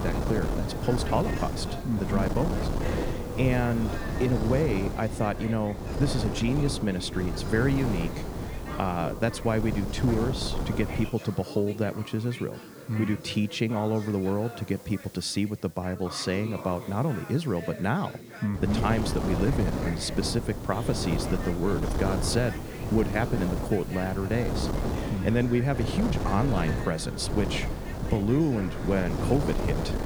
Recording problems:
wind noise on the microphone; heavy; until 11 s and from 19 s on; 5 dB below the speech
background chatter; noticeable; throughout; 4 voices, 15 dB below the speech
hiss; faint; throughout; 25 dB below the speech

